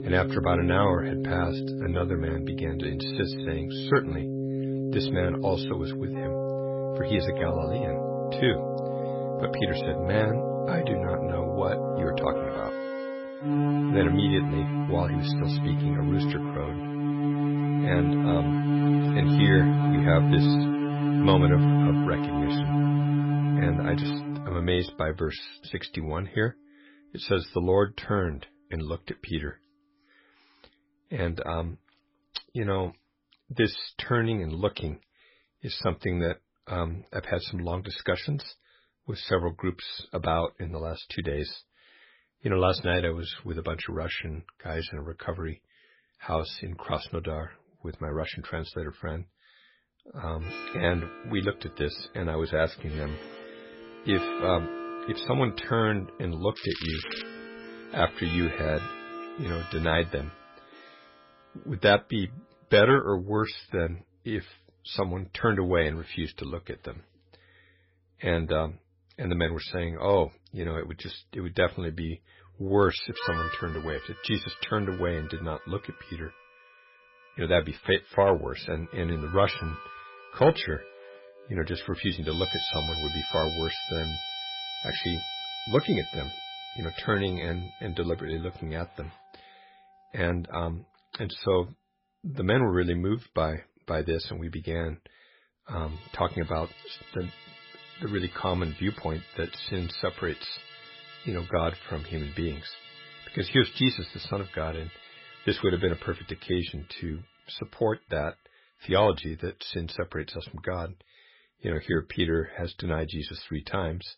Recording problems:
garbled, watery; badly; nothing above 5.5 kHz
background music; very loud; throughout; 1 dB above the speech
crackling; loud; at 57 s; 7 dB below the speech

